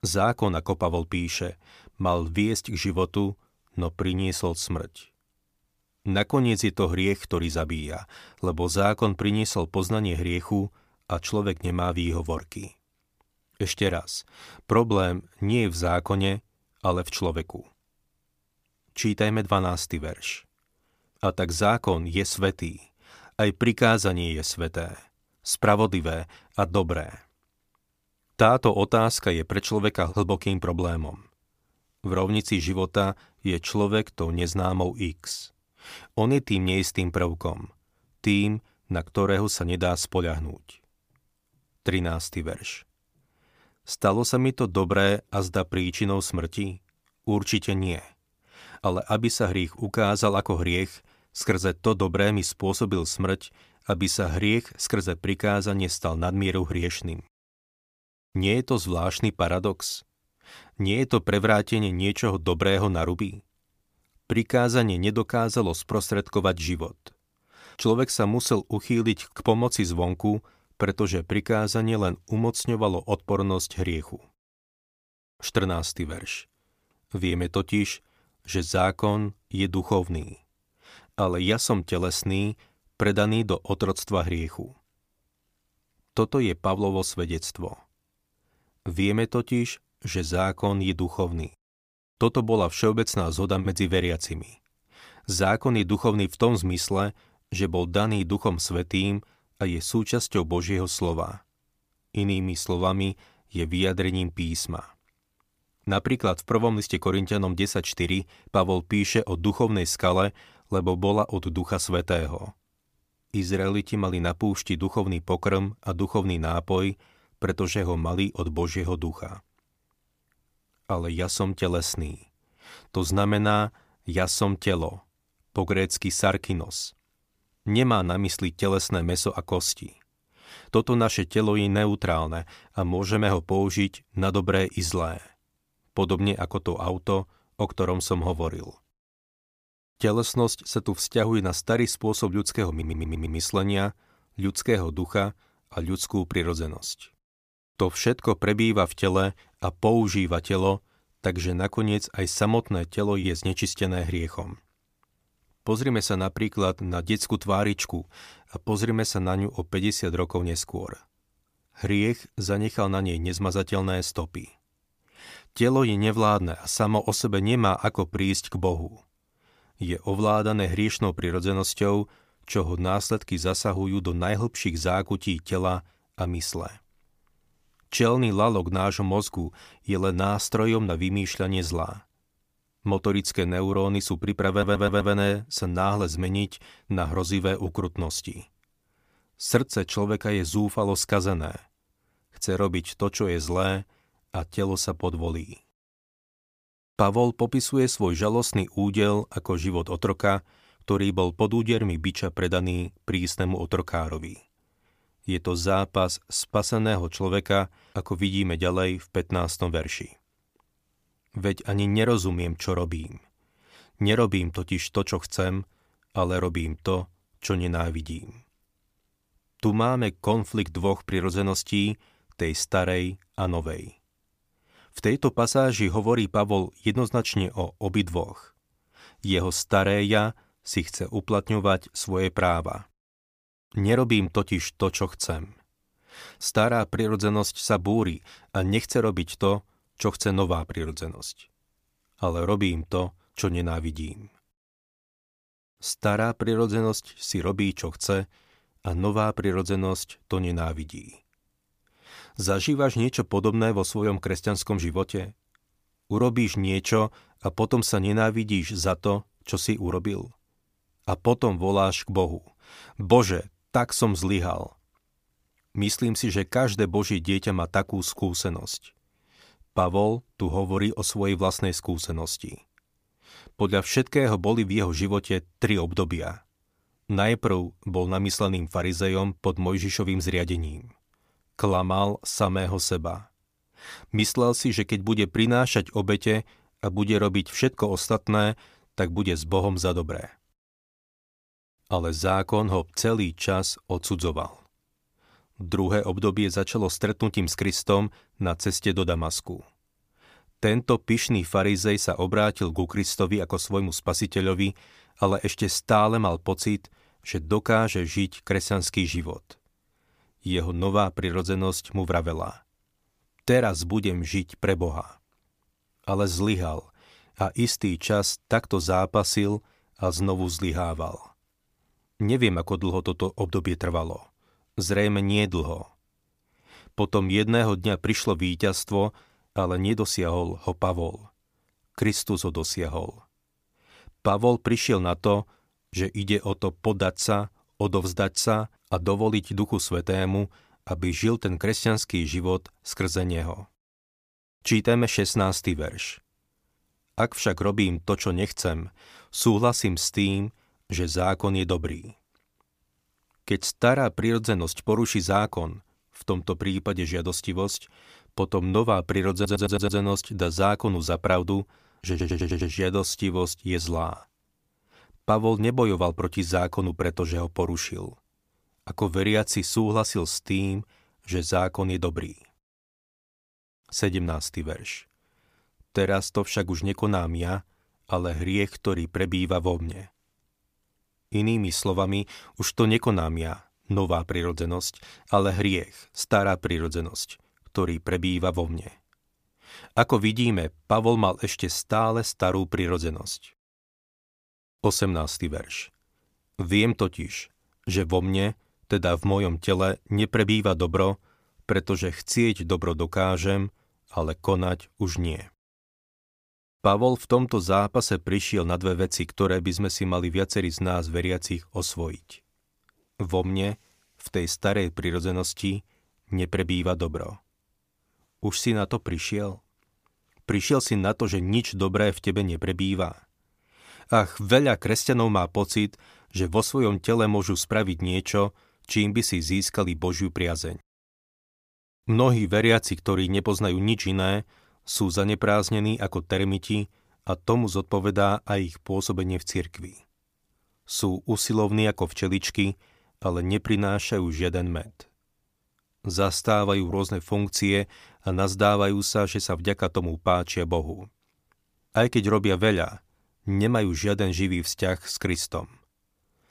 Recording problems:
audio stuttering; 4 times, first at 2:23

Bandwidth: 15 kHz